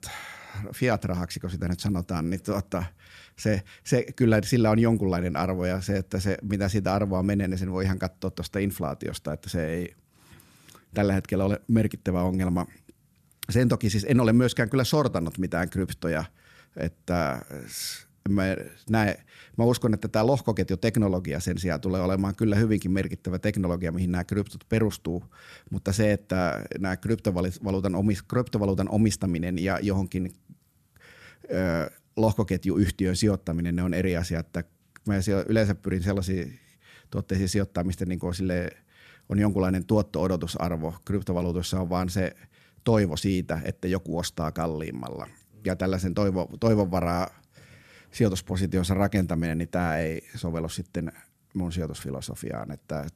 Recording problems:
none

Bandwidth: 14 kHz